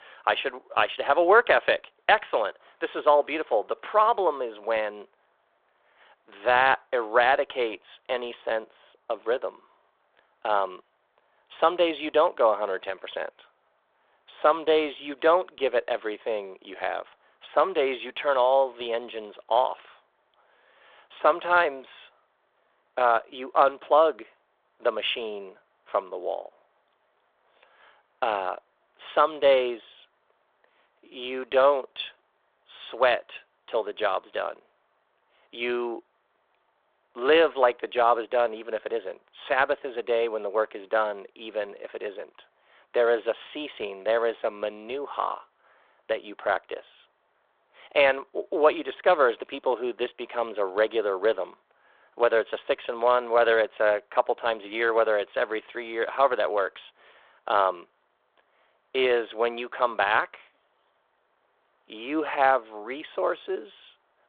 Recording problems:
phone-call audio

